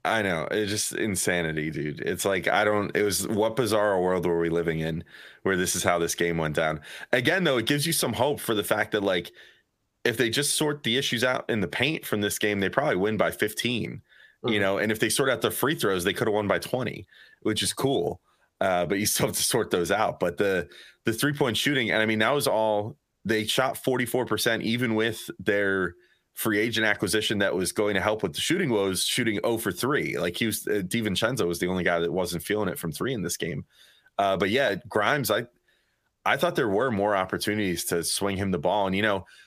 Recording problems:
squashed, flat; heavily

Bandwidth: 15 kHz